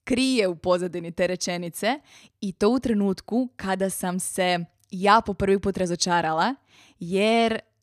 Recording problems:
none

